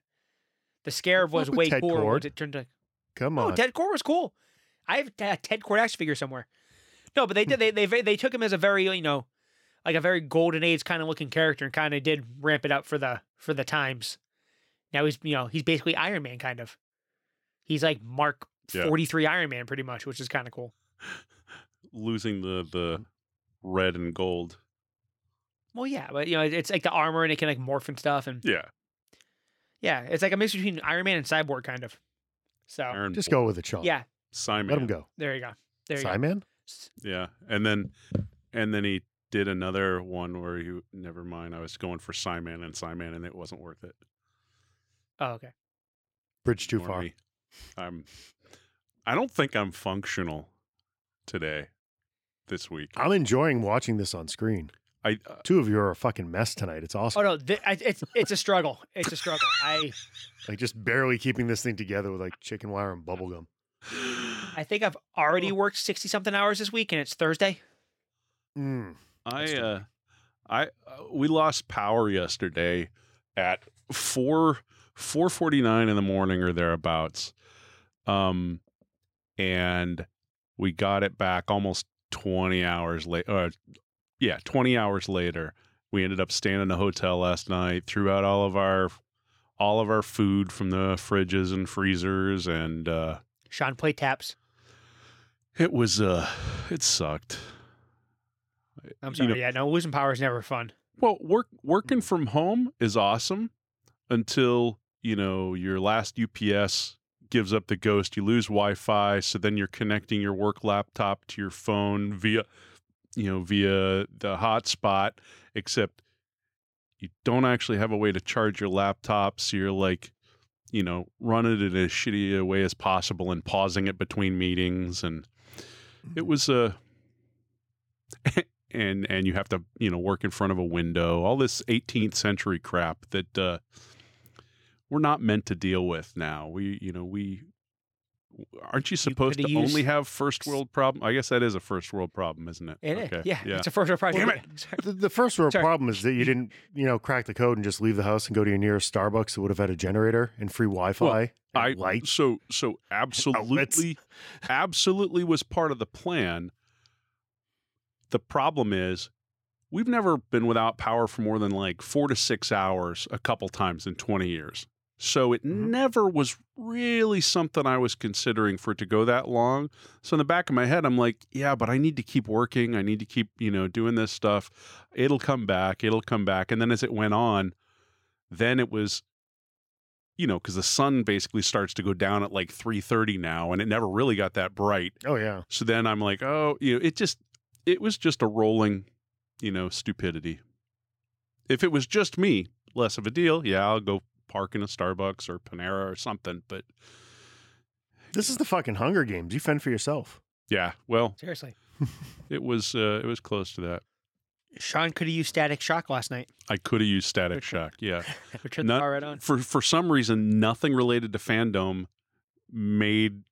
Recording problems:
none

